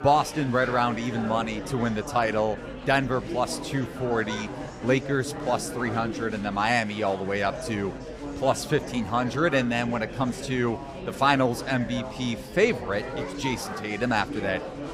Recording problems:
murmuring crowd; loud; throughout; 9 dB below the speech

